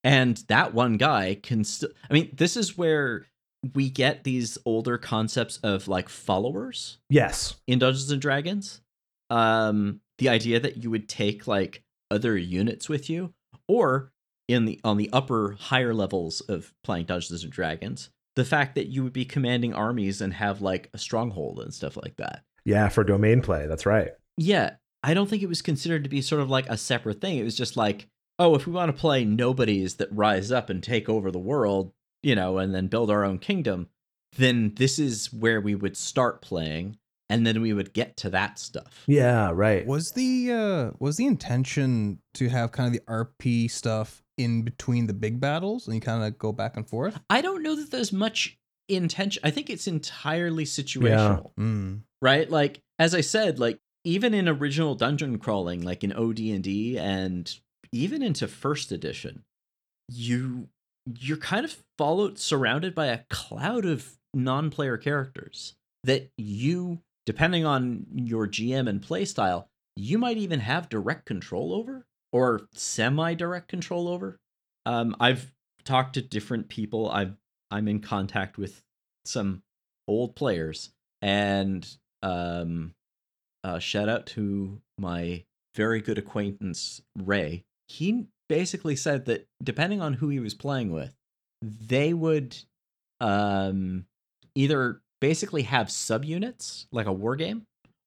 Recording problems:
none

